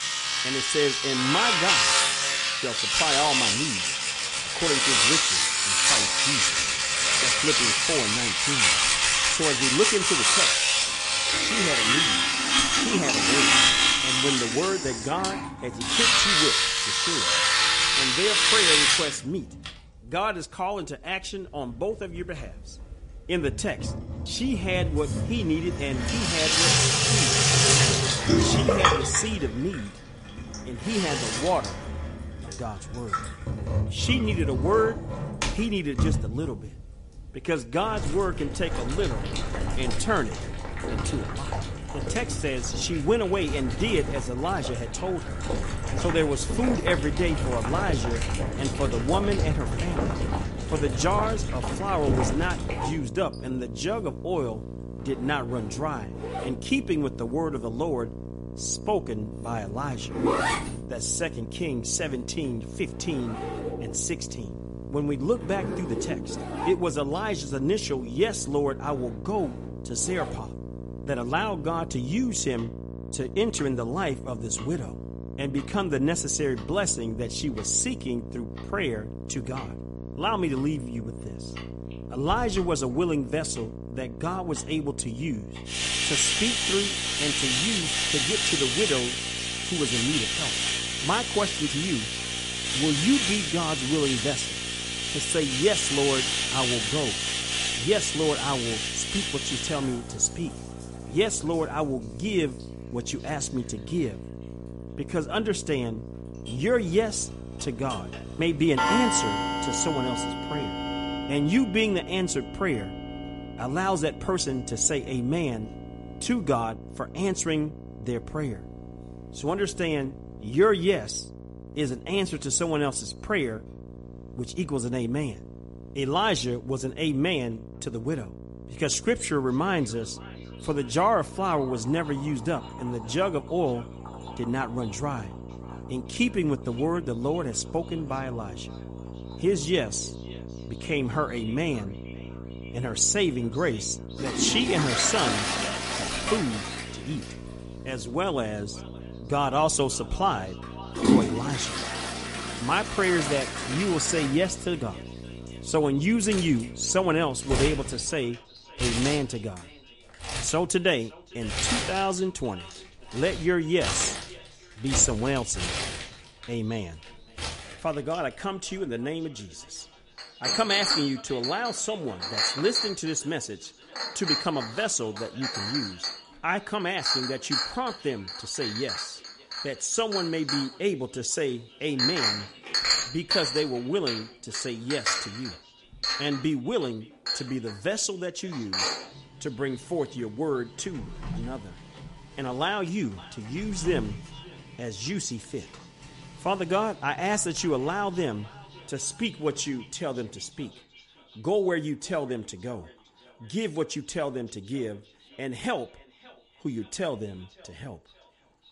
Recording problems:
echo of what is said; faint; from 2:09 on; 560 ms later, 20 dB below the speech
garbled, watery; slightly; nothing above 9 kHz
household noises; very loud; throughout; 4 dB above the speech
electrical hum; noticeable; from 48 s to 2:38; 60 Hz, 15 dB below the speech

